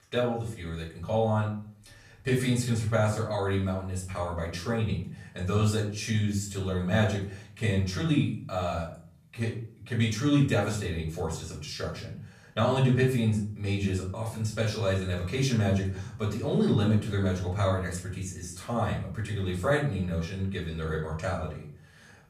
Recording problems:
off-mic speech; far
room echo; slight; dies away in 0.5 s

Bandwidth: 14.5 kHz